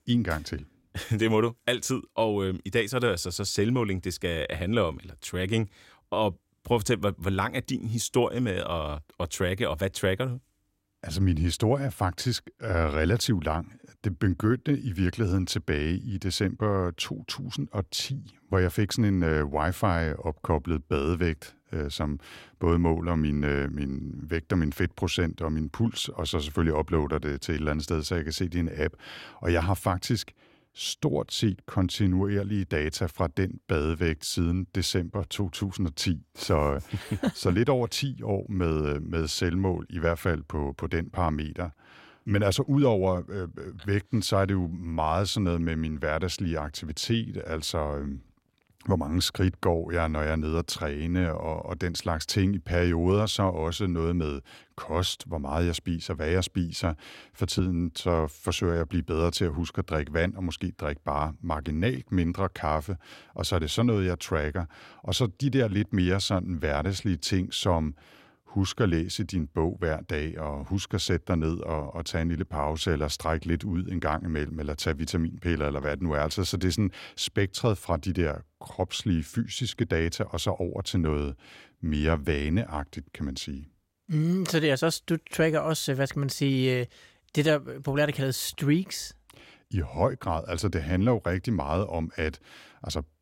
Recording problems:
none

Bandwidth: 16 kHz